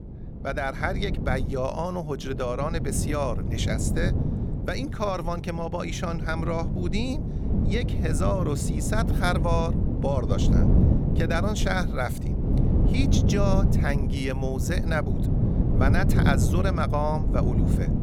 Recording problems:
wind noise on the microphone; heavy; 6 dB below the speech

